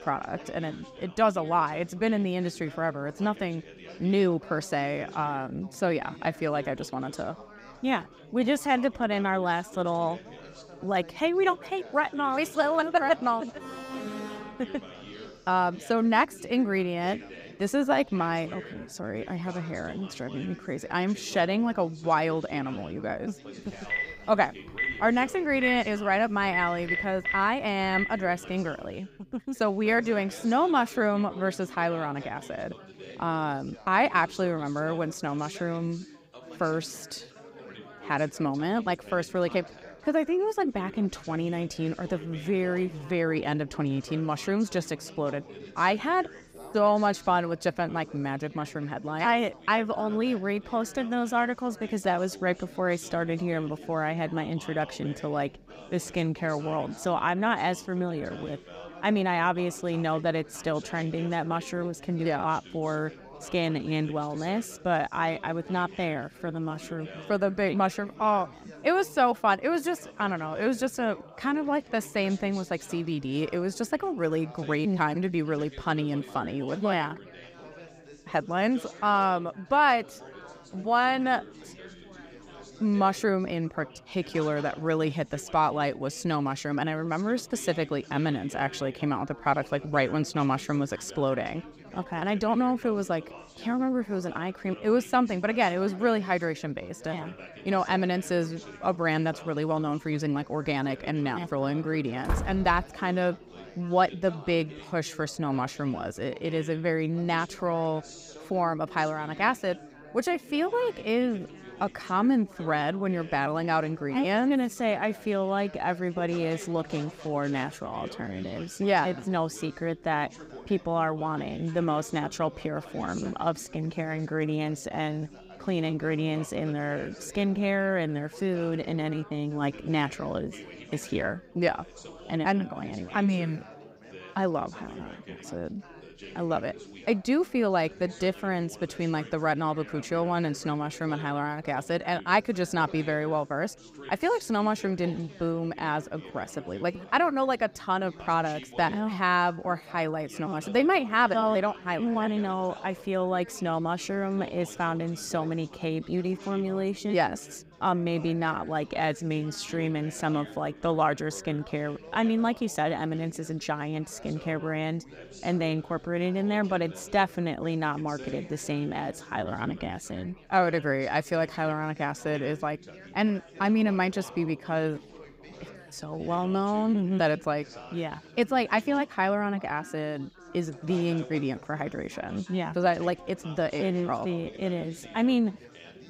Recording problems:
chatter from many people; noticeable; throughout; 20 dB below the speech
alarm; noticeable; from 14 to 15 s; peak 7 dB below the speech
phone ringing; noticeable; from 24 to 28 s; peak 1 dB below the speech
door banging; noticeable; at 1:42; peak 3 dB below the speech

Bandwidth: 15.5 kHz